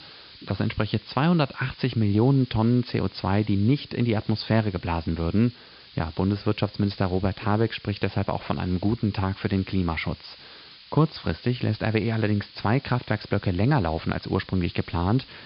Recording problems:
high frequencies cut off; severe; nothing above 5 kHz
hiss; faint; throughout; 20 dB below the speech

